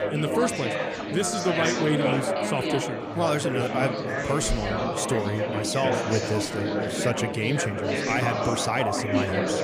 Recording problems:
chatter from many people; very loud; throughout; 1 dB above the speech

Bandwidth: 15 kHz